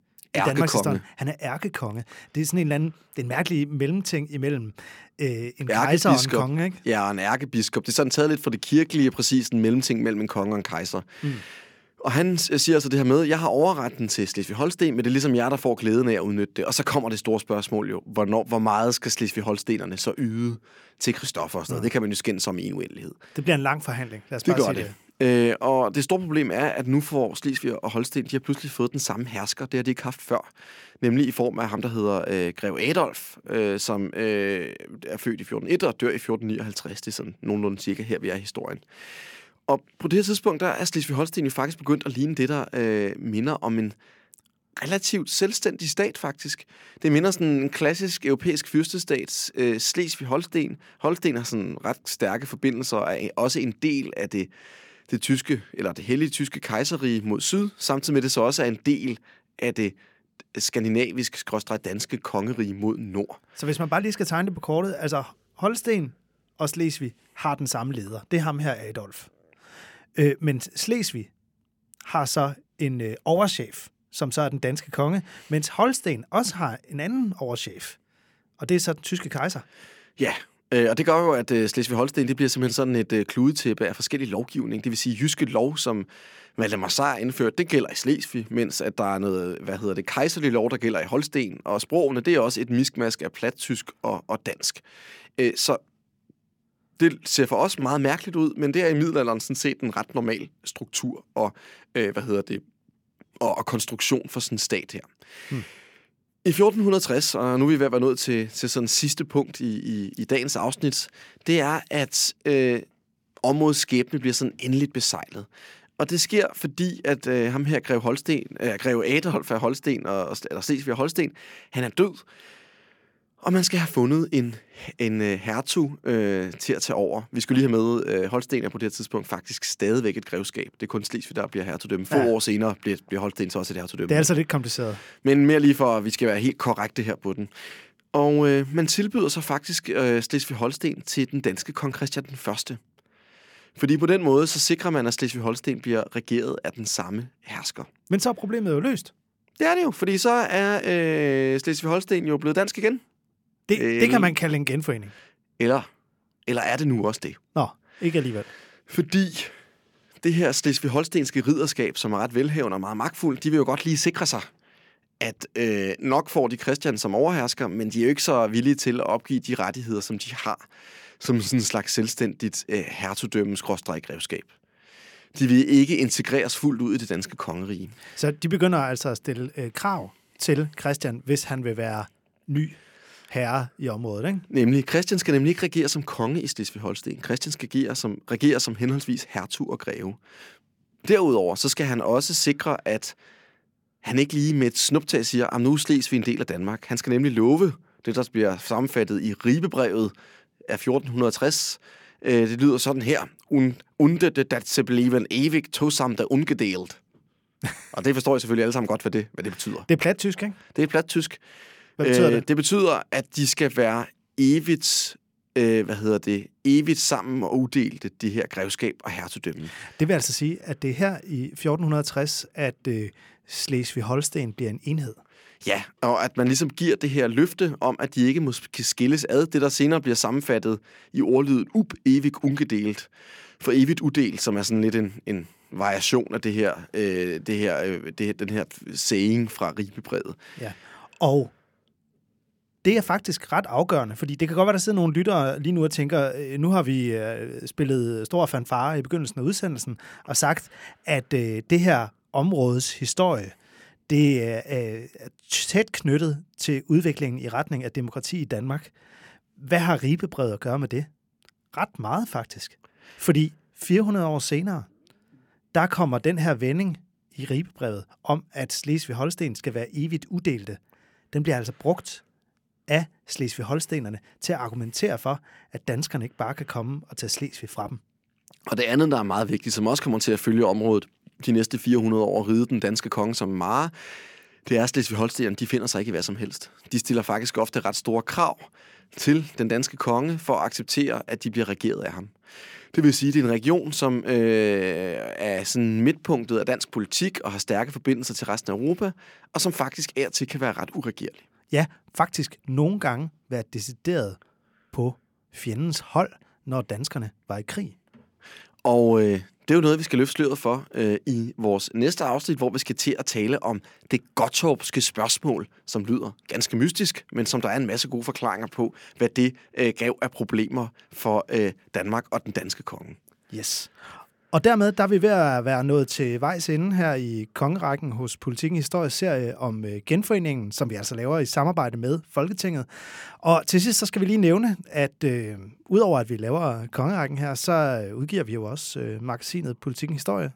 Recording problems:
none

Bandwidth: 17 kHz